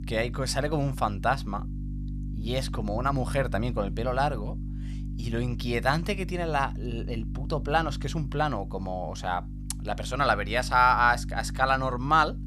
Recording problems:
electrical hum; faint; throughout; 50 Hz, 20 dB below the speech

